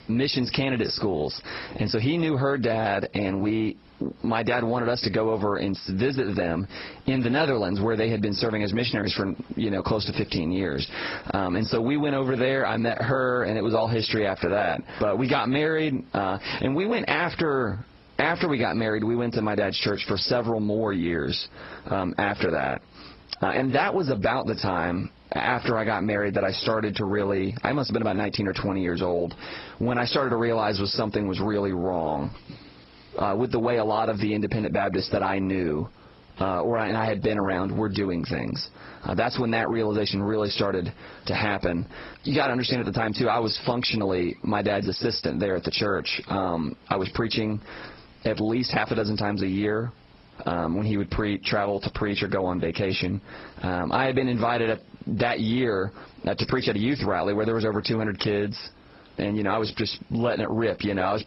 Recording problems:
garbled, watery; badly; nothing above 5.5 kHz
squashed, flat; heavily

